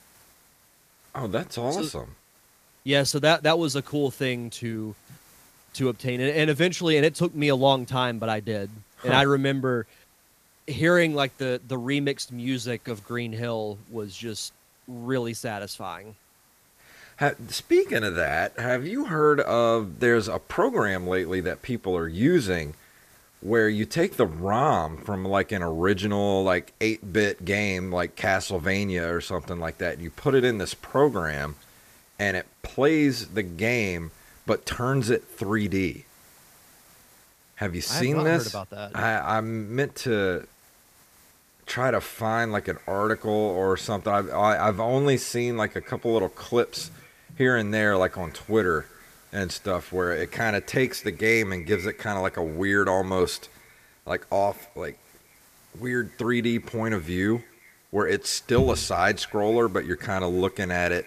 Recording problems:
echo of what is said; faint; from 42 s on; 220 ms later, 25 dB below the speech
hiss; faint; throughout; 30 dB below the speech

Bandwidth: 14.5 kHz